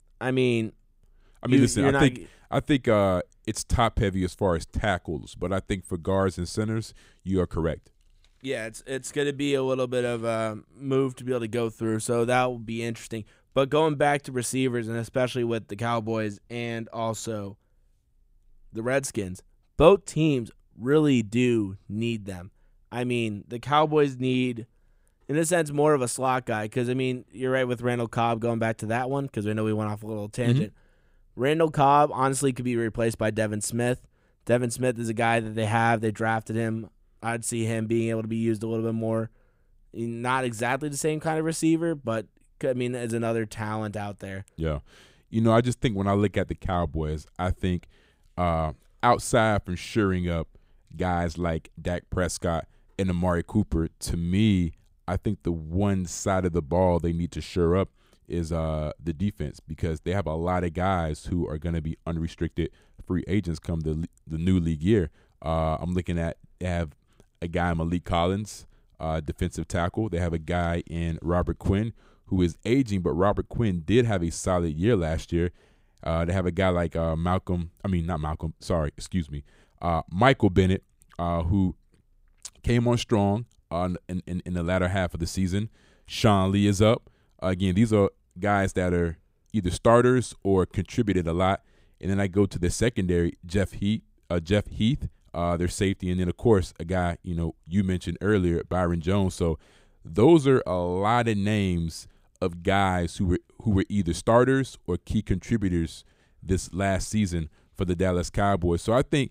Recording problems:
none

